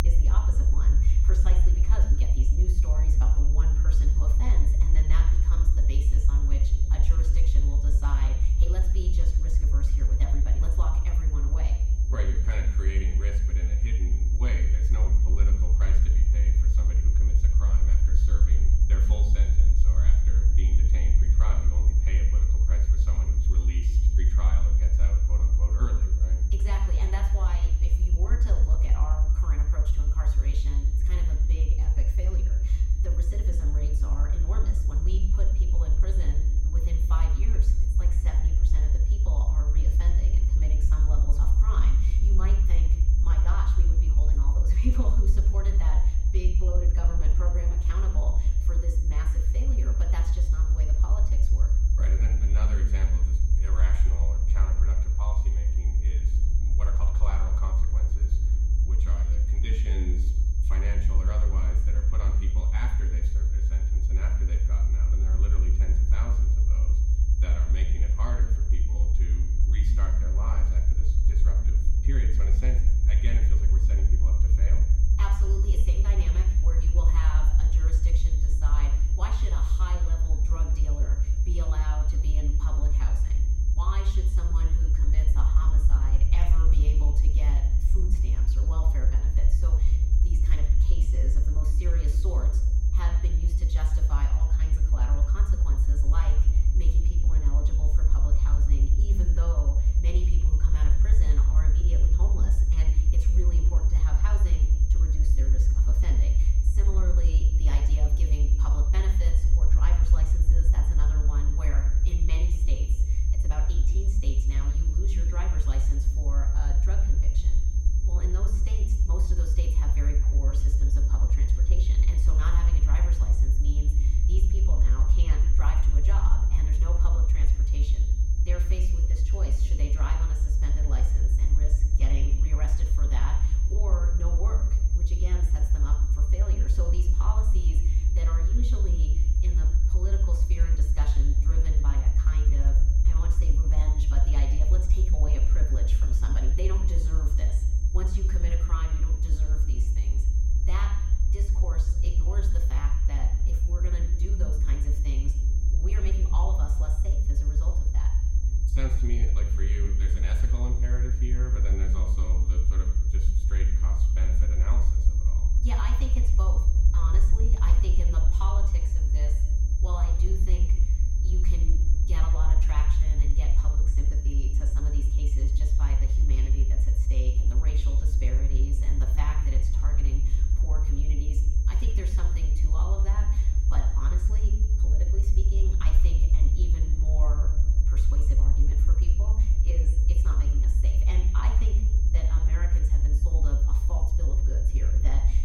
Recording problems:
room echo; noticeable; dies away in 0.8 s
off-mic speech; somewhat distant
high-pitched whine; loud; throughout; 6.5 kHz, 9 dB below the speech
low rumble; loud; throughout; 2 dB below the speech
electrical hum; faint; throughout; 50 Hz, 20 dB below the speech

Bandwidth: 16 kHz